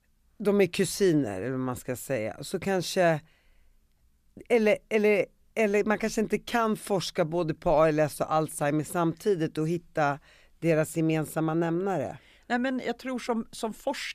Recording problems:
none

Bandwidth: 14.5 kHz